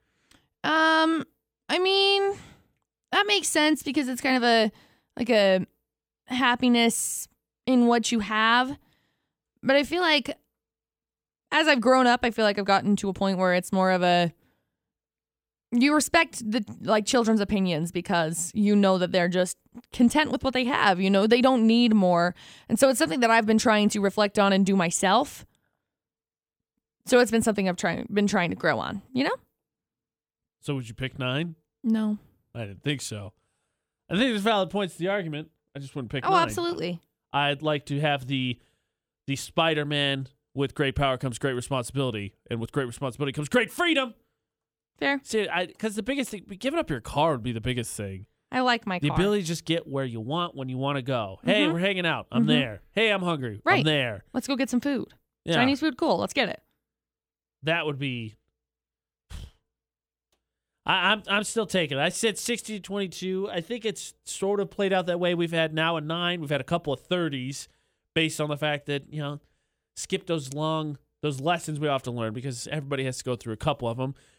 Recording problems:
none

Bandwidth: 18.5 kHz